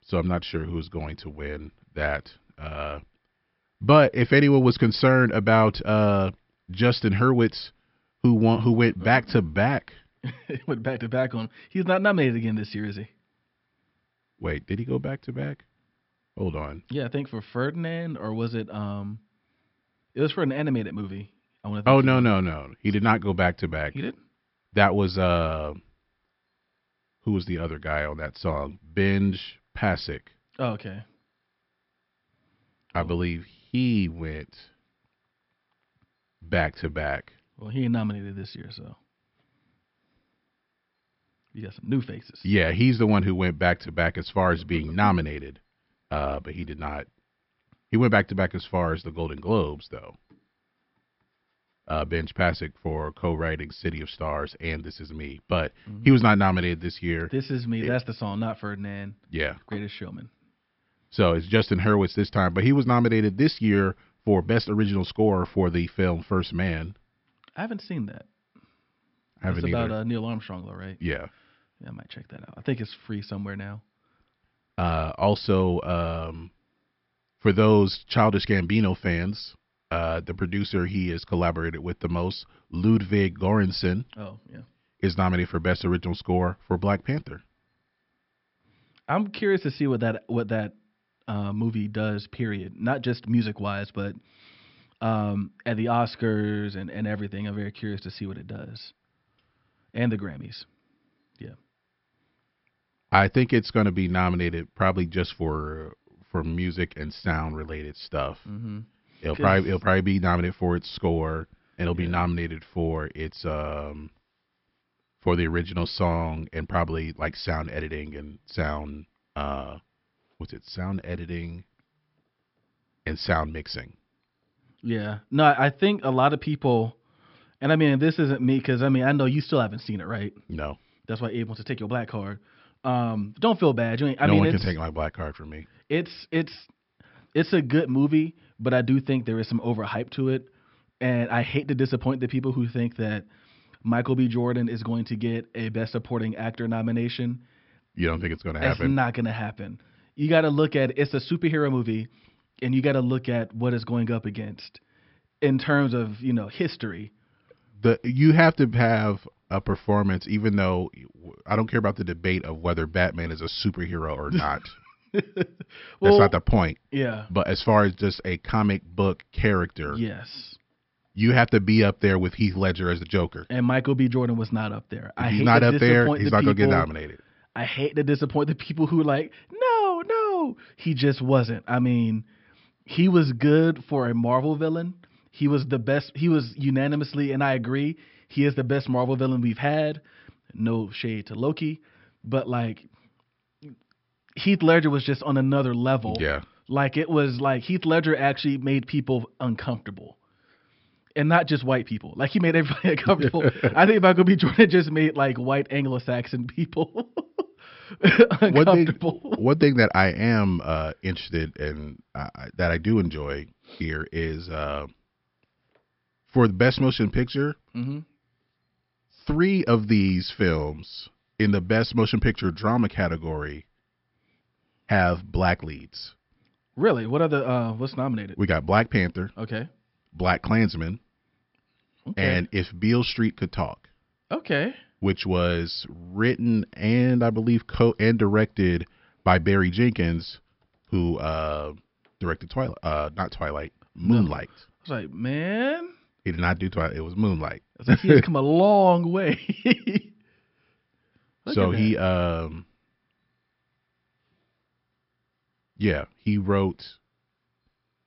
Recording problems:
high frequencies cut off; noticeable; nothing above 5.5 kHz

